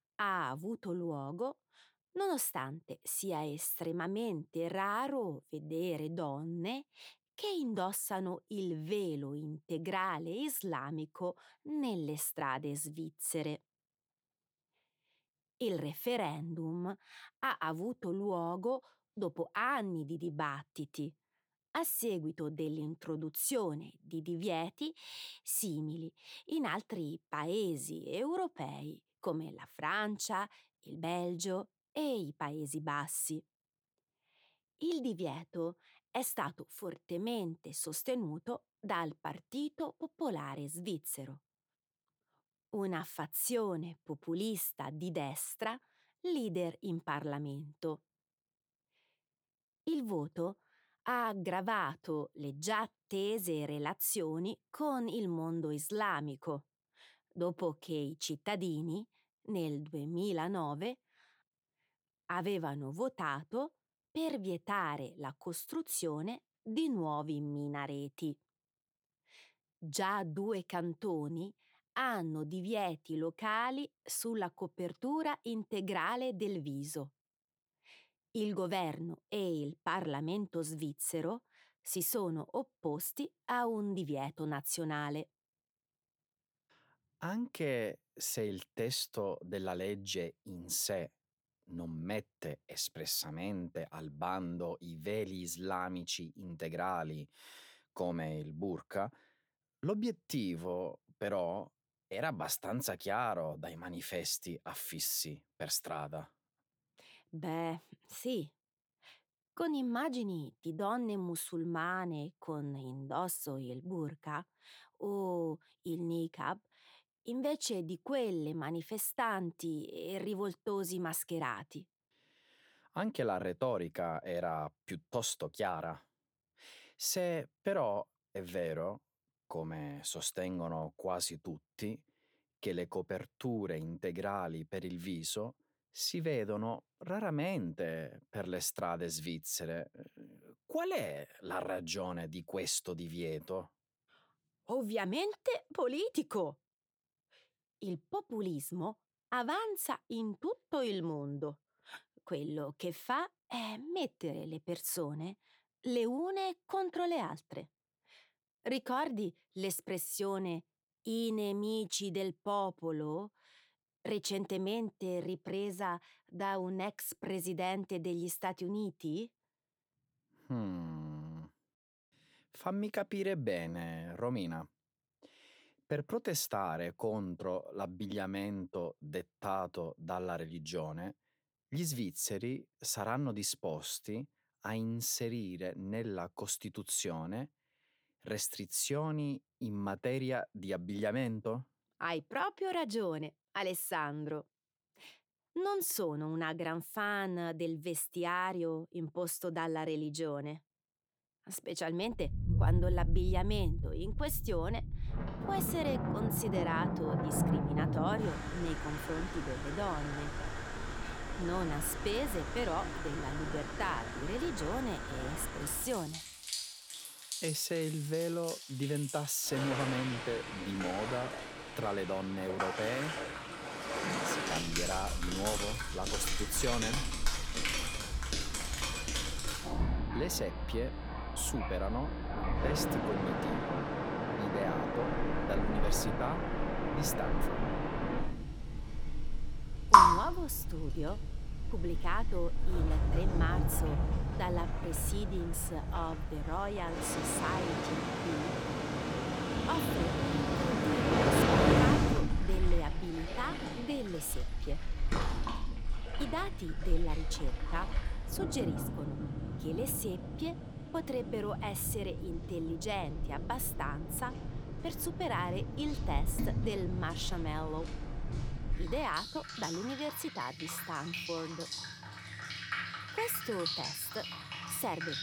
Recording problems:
rain or running water; very loud; from 3:22 on; 2 dB above the speech

